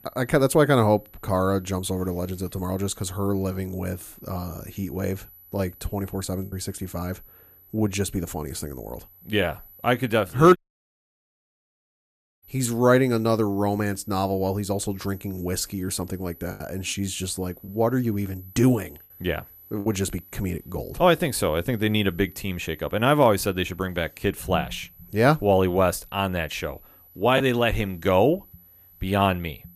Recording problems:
high-pitched whine; faint; throughout; 12 kHz, 25 dB below the speech
choppy; occasionally; 1% of the speech affected
audio cutting out; at 11 s for 2 s

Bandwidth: 15 kHz